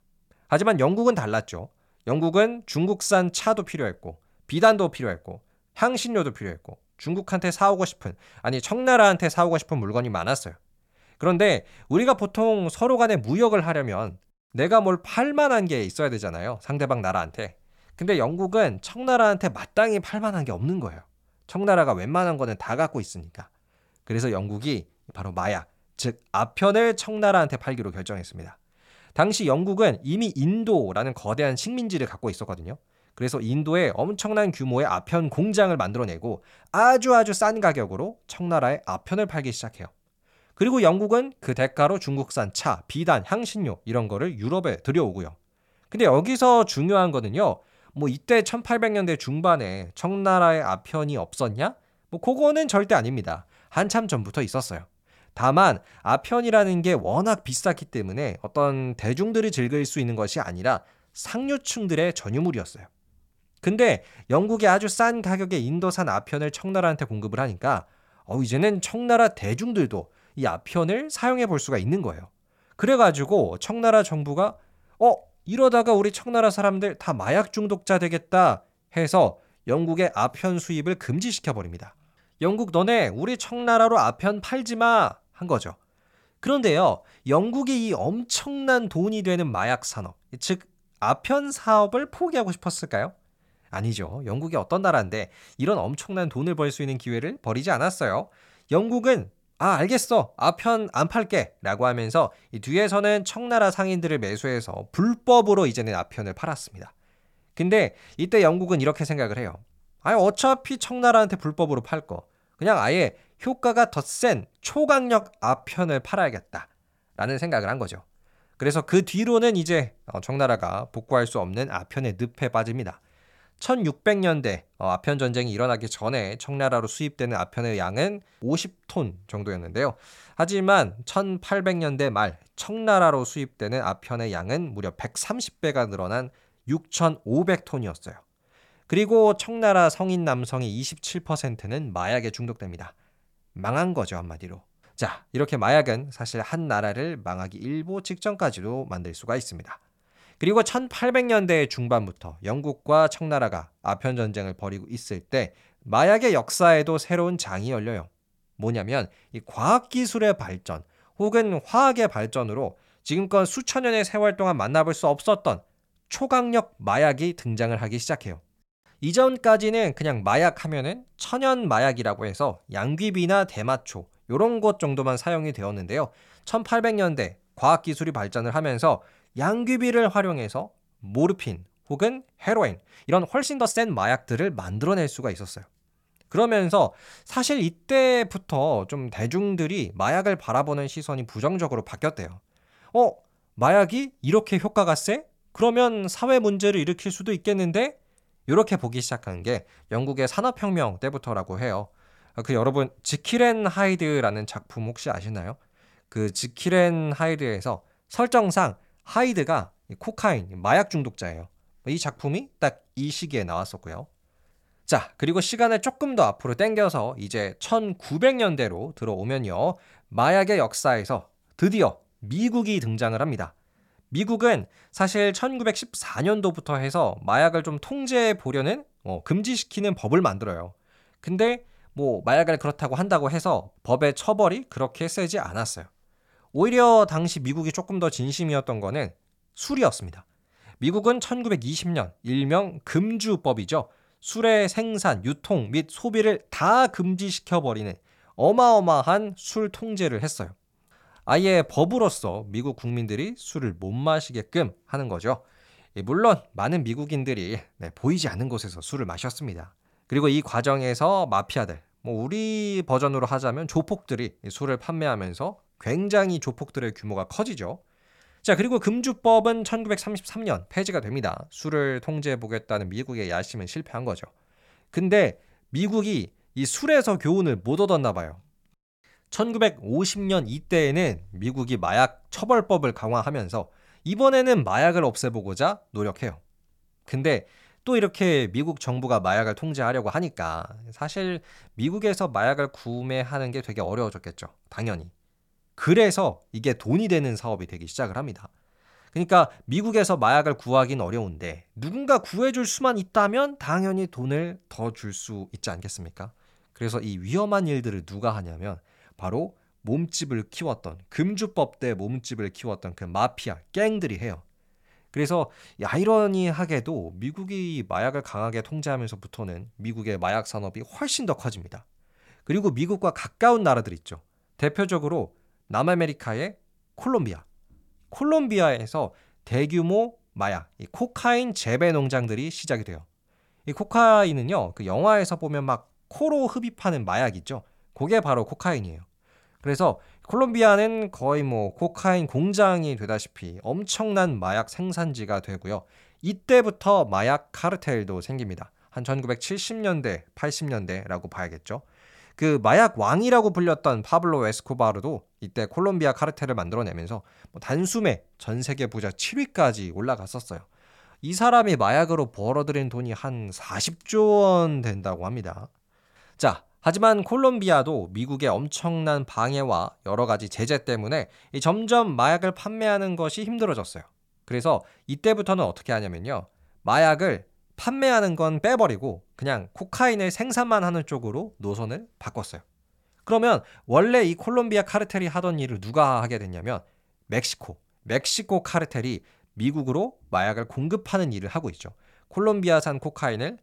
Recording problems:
uneven, jittery; strongly; from 1:55 to 6:05

